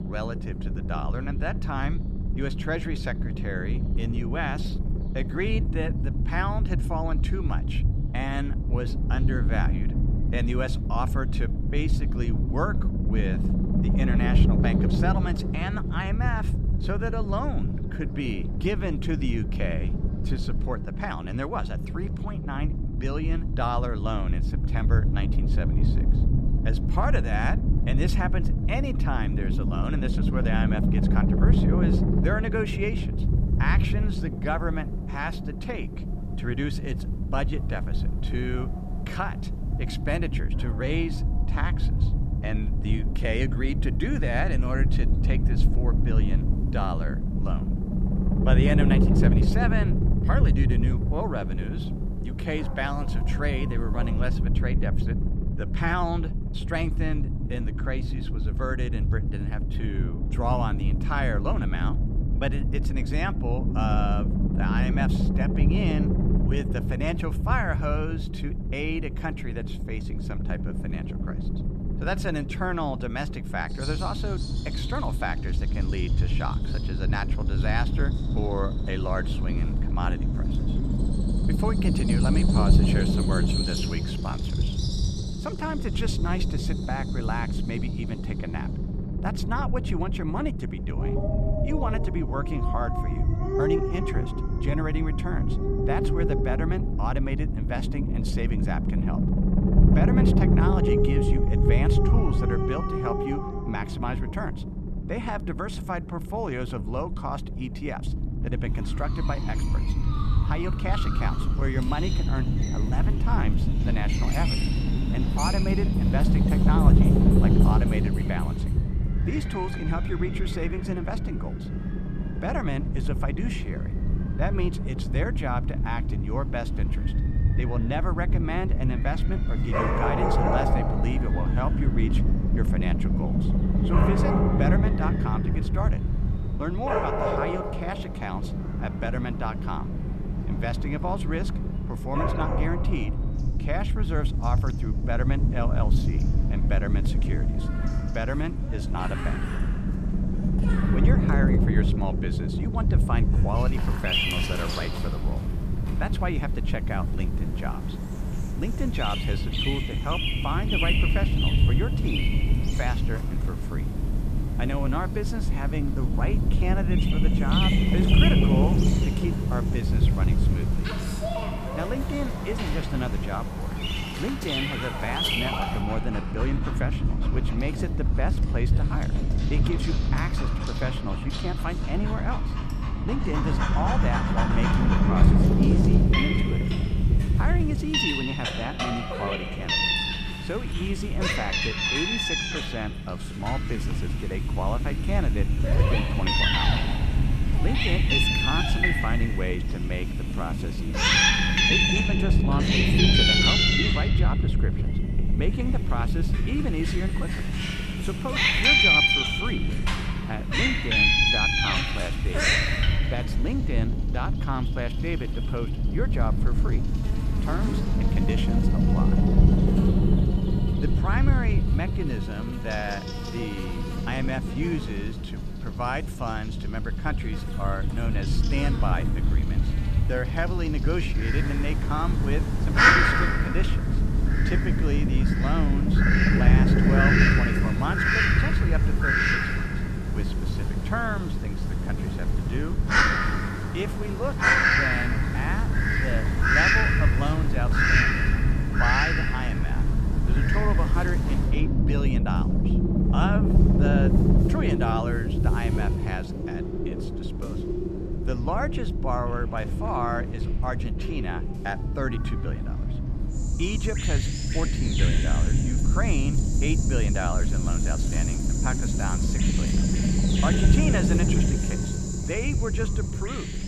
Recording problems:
animal sounds; very loud; throughout; 5 dB above the speech
low rumble; loud; throughout; 4 dB below the speech

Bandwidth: 14.5 kHz